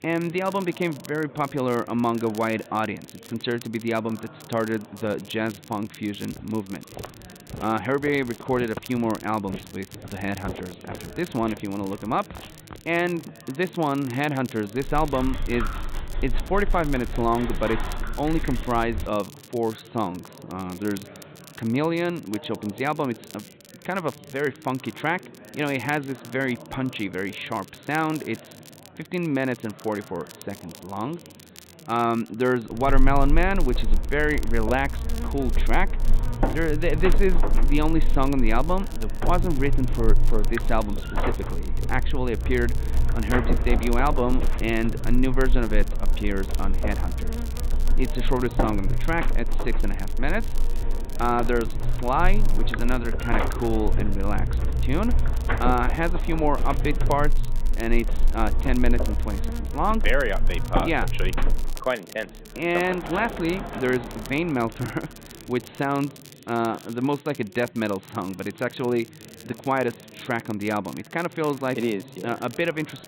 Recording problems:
high frequencies cut off; severe; nothing above 4 kHz
chatter from many people; noticeable; throughout; 20 dB below the speech
crackle, like an old record; noticeable; 20 dB below the speech
electrical hum; very faint; from 33 s to 1:02; 60 Hz, 9 dB below the speech
footsteps; faint; from 6.5 to 13 s; peak 10 dB below the speech
dog barking; noticeable; from 15 to 19 s; peak 5 dB below the speech
door banging; noticeable; from 1:02 to 1:06; peak 6 dB below the speech

